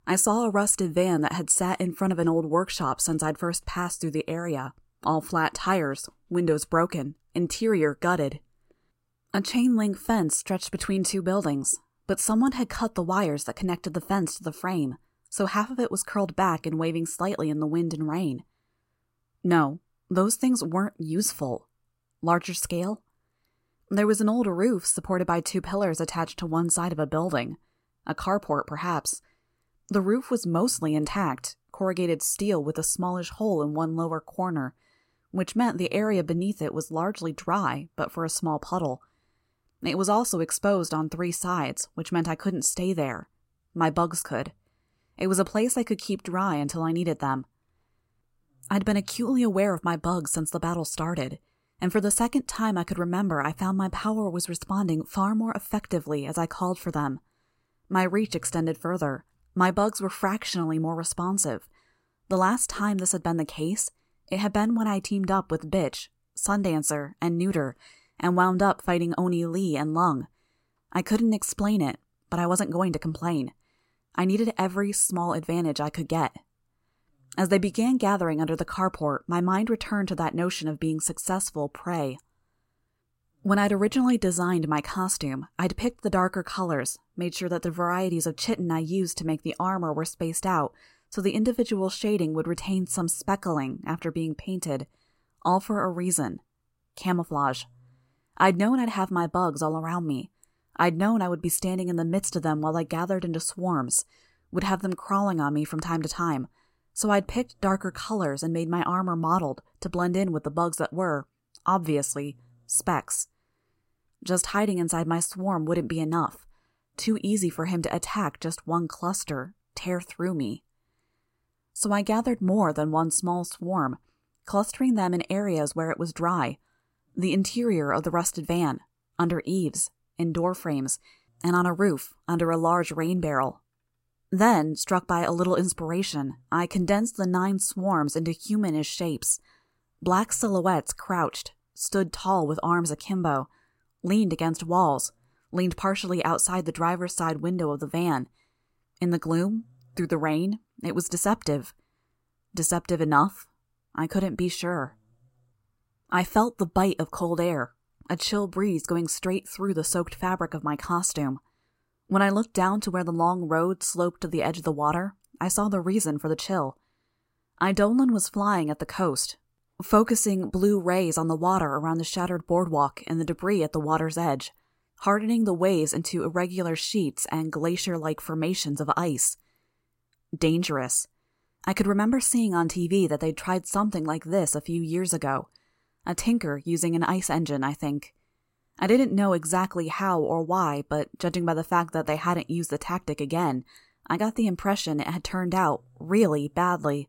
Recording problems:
none

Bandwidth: 16 kHz